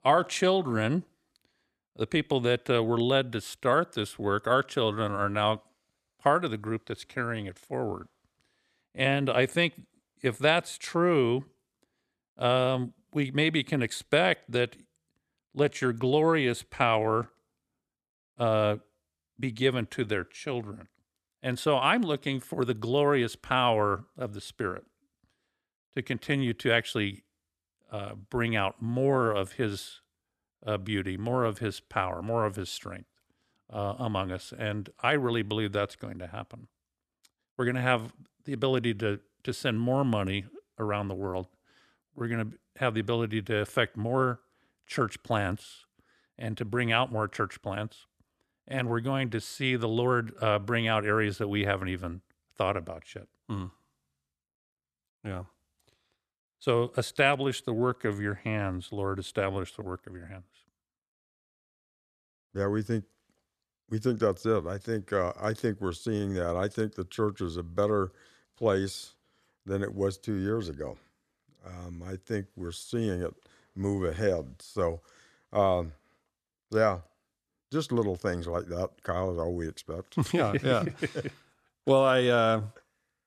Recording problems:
none

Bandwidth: 13.5 kHz